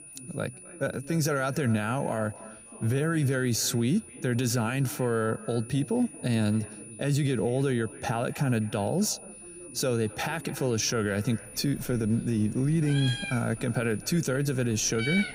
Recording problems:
echo of what is said; faint; throughout; 260 ms later, 20 dB below the speech
high-pitched whine; noticeable; throughout; 9.5 kHz, 15 dB below the speech
animal sounds; noticeable; throughout; 10 dB below the speech
background chatter; faint; throughout; 3 voices, 20 dB below the speech

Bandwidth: 15.5 kHz